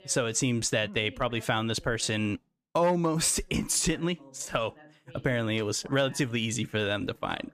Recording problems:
voice in the background; faint; throughout; 25 dB below the speech

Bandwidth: 14.5 kHz